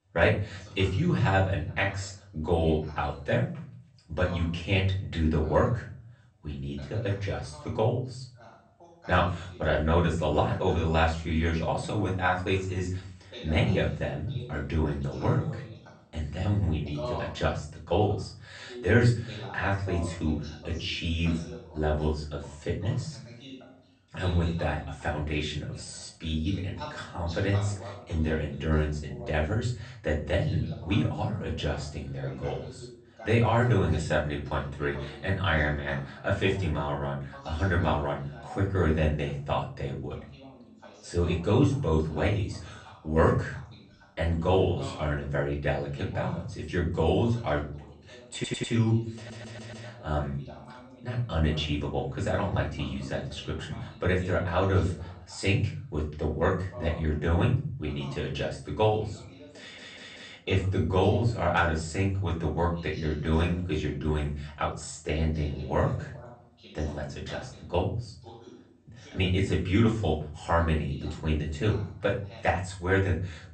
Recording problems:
off-mic speech; far
room echo; slight; dies away in 0.4 s
garbled, watery; slightly; nothing above 8.5 kHz
voice in the background; noticeable; throughout; 20 dB below the speech
uneven, jittery; slightly; from 18 s to 1:09
audio stuttering; at 48 s, at 49 s and at 1:00

